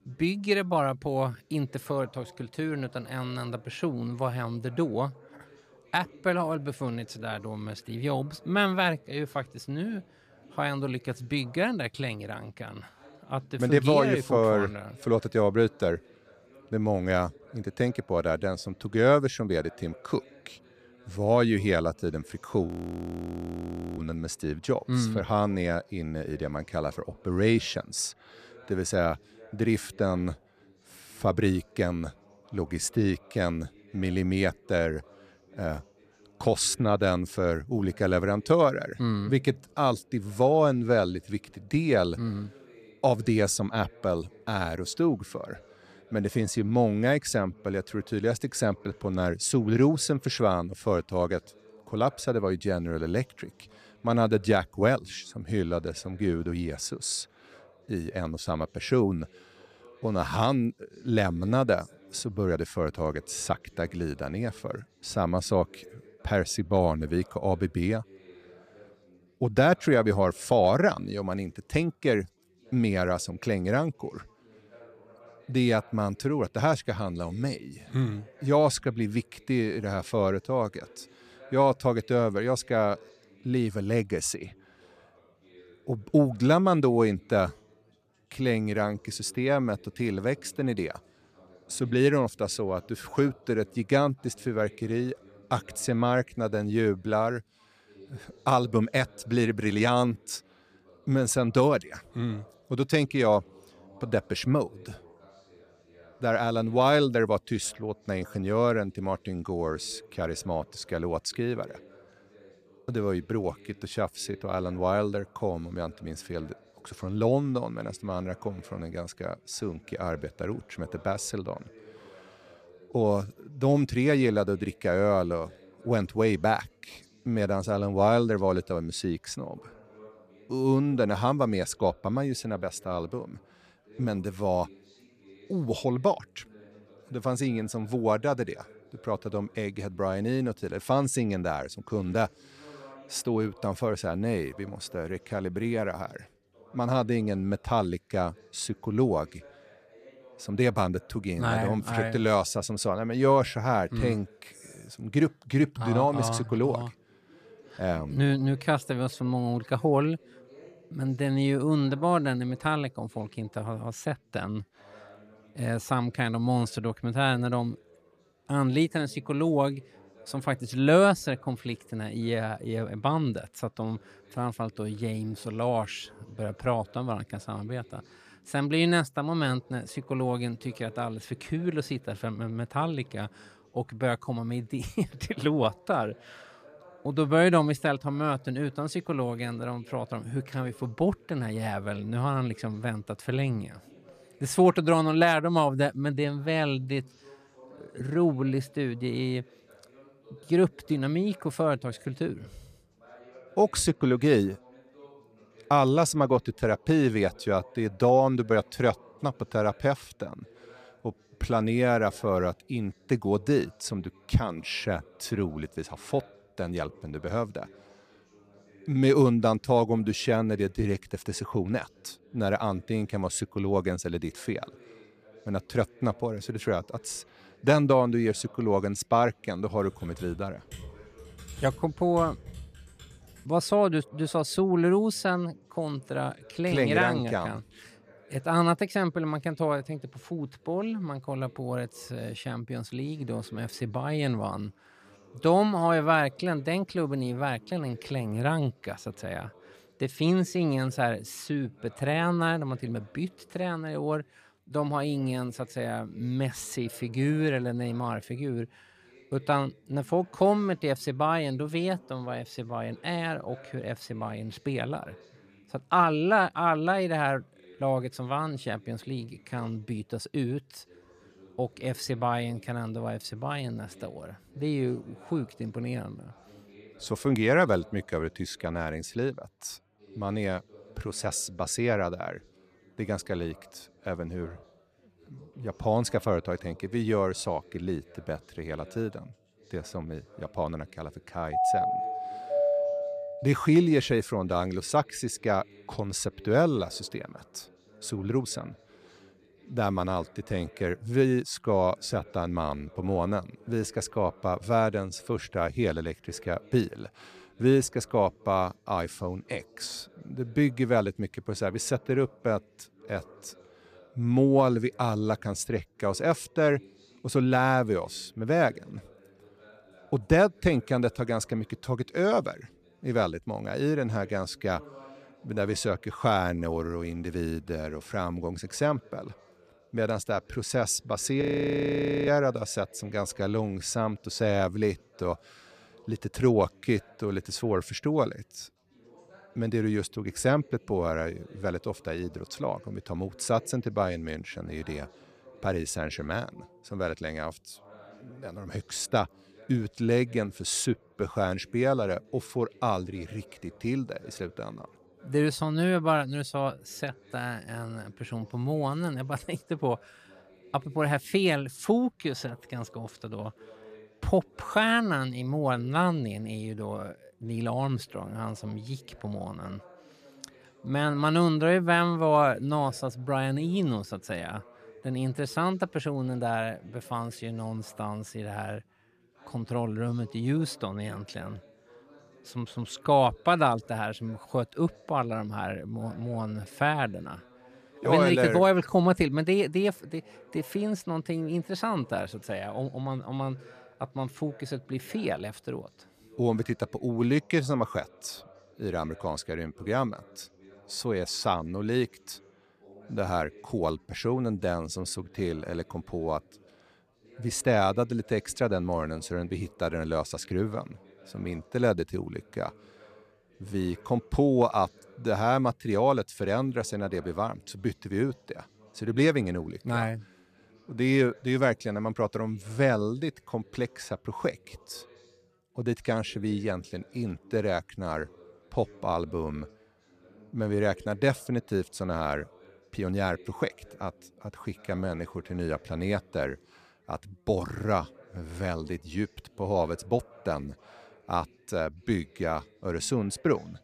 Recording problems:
background chatter; faint; throughout; 4 voices, 25 dB below the speech
audio freezing; at 23 s for 1.5 s and at 5:31 for 1 s
keyboard typing; faint; from 3:50 to 3:53; peak 15 dB below the speech
doorbell; loud; from 4:52 to 4:53; peak 3 dB above the speech

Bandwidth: 14.5 kHz